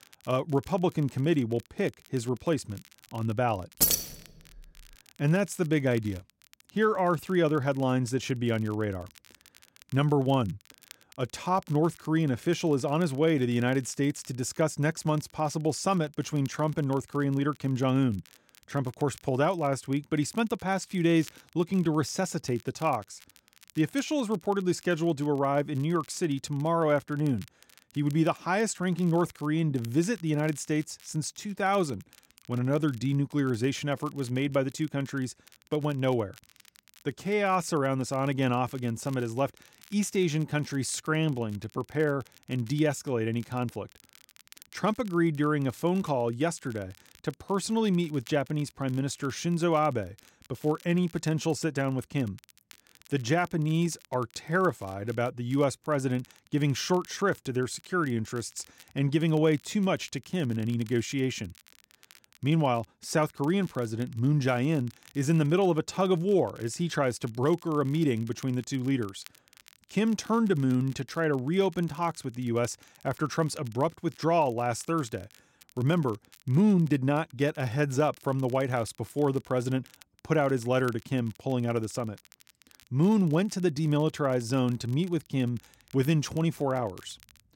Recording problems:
crackle, like an old record; faint; 25 dB below the speech
jangling keys; loud; at 4 s; peak 5 dB above the speech

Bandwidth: 16 kHz